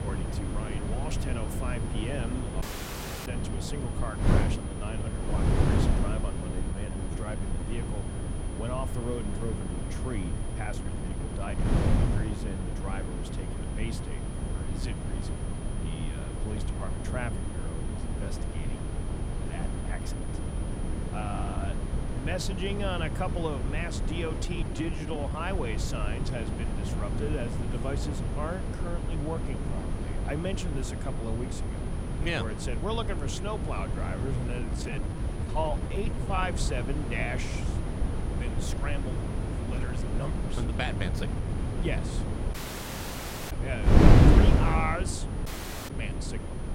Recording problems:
wind noise on the microphone; heavy; 1 dB below the speech
high-pitched whine; noticeable; throughout; 9.5 kHz, 15 dB below the speech
audio cutting out; at 2.5 s for 0.5 s, at 43 s for 1 s and at 45 s
uneven, jittery; strongly; from 6.5 to 42 s

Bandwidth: 16 kHz